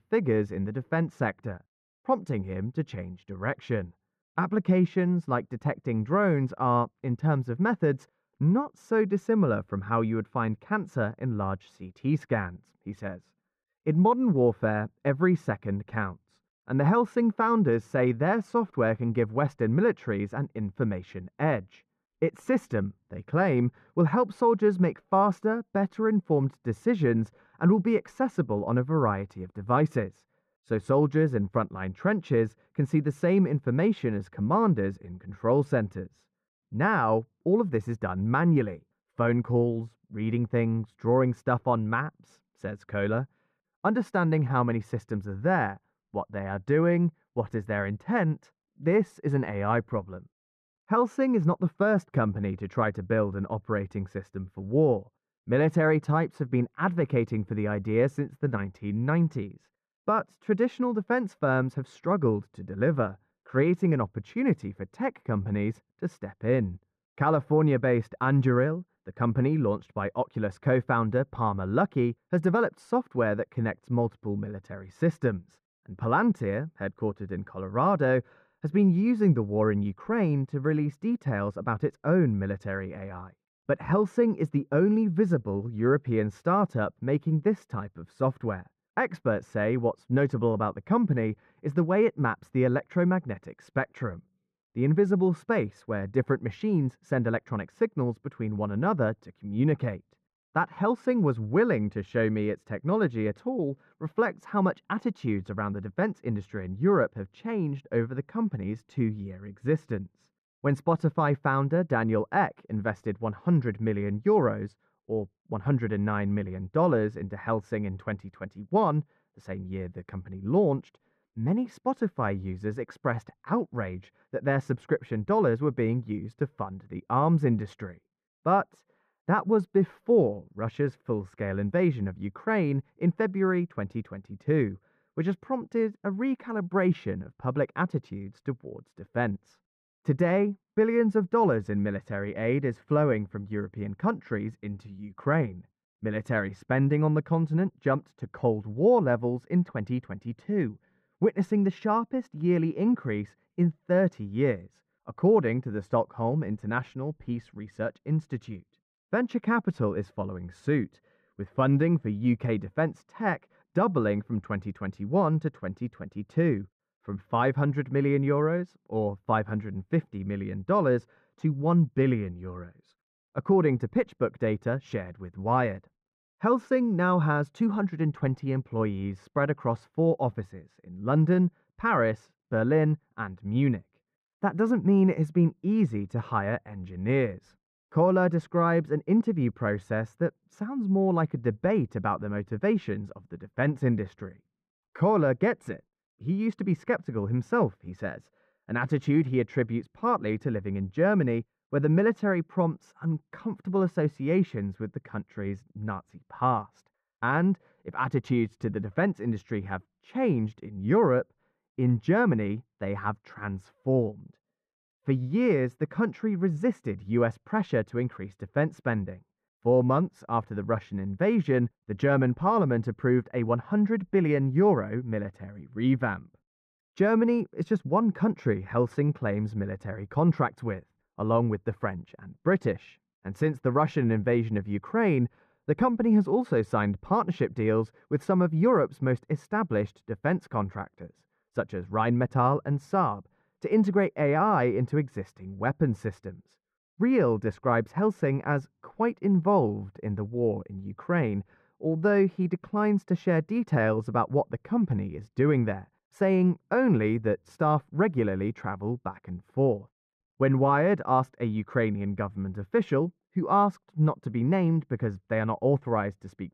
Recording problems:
muffled; very; fading above 3.5 kHz

